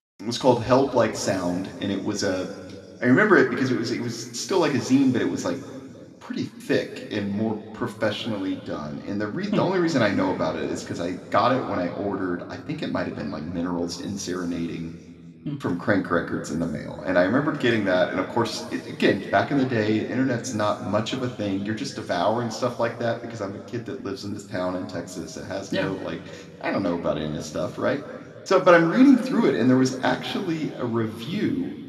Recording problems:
room echo; slight; dies away in 2.1 s
off-mic speech; somewhat distant

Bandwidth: 13.5 kHz